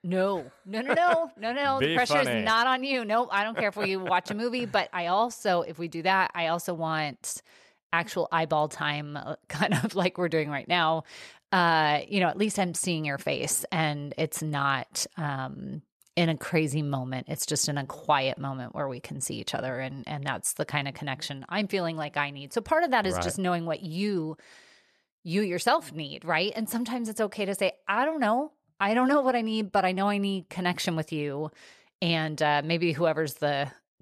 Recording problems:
none

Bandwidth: 13.5 kHz